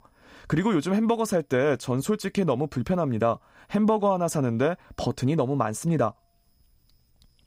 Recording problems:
none

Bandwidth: 15.5 kHz